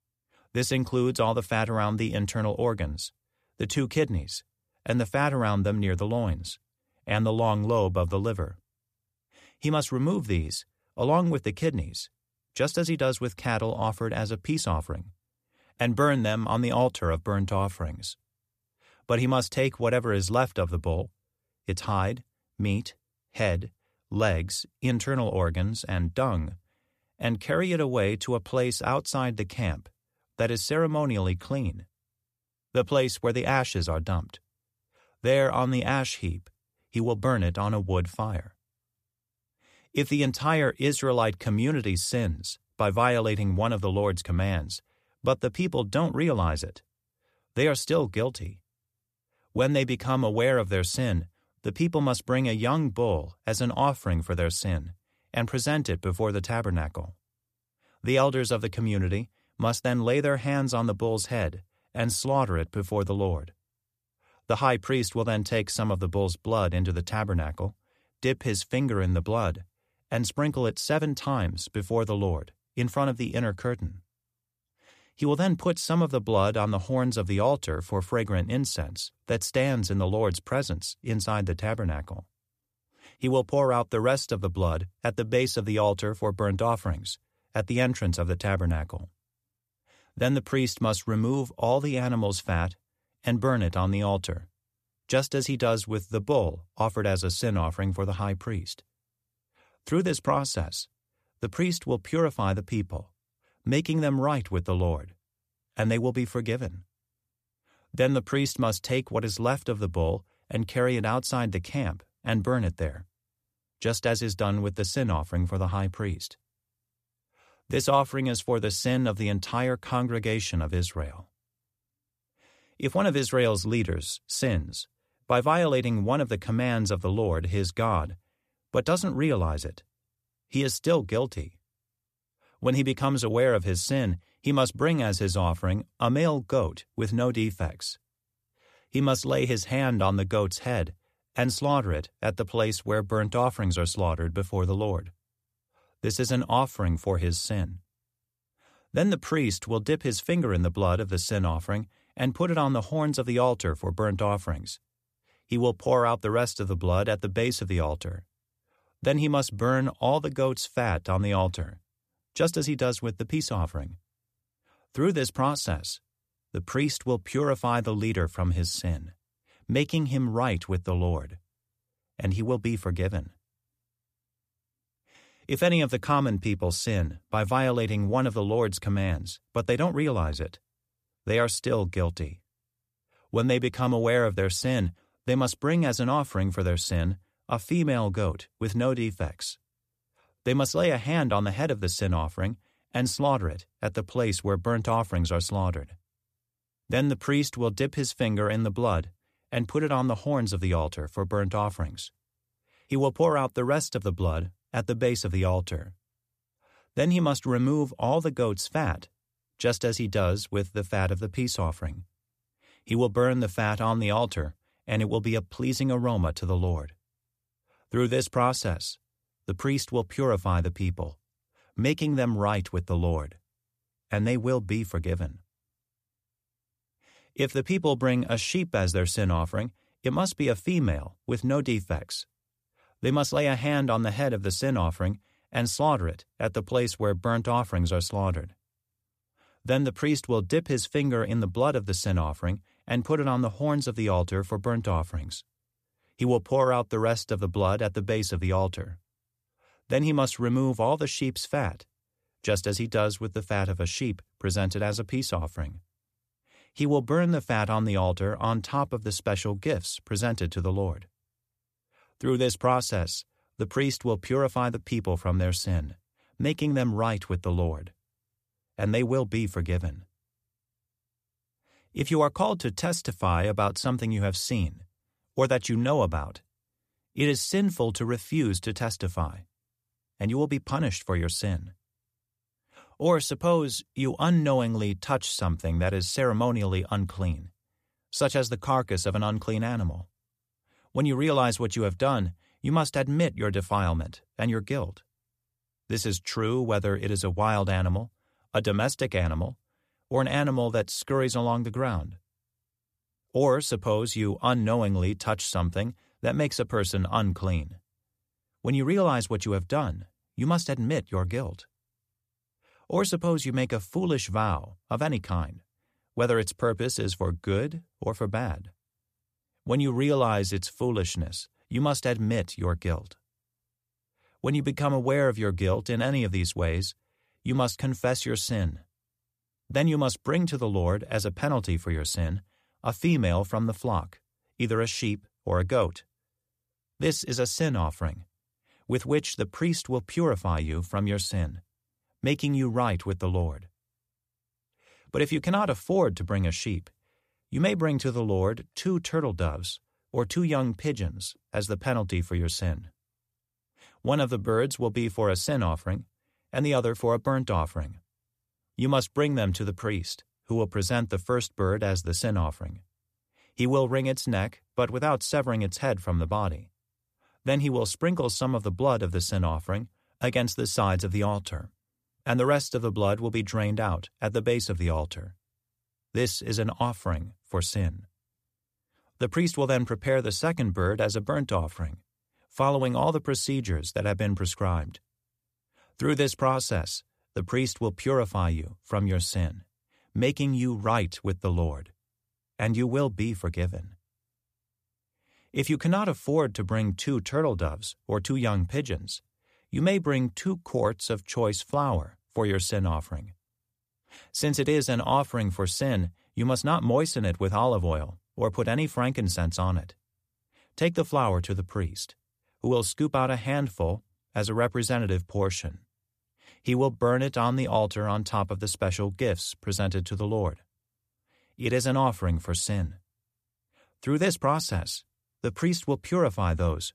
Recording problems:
none

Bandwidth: 14.5 kHz